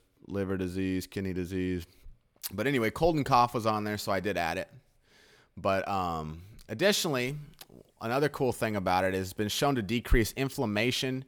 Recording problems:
none

